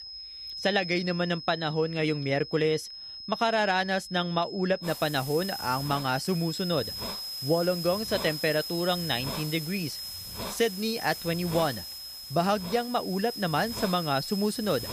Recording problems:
high-pitched whine; loud; throughout; 5 kHz, 9 dB below the speech
hiss; noticeable; from 5 s on; 10 dB below the speech

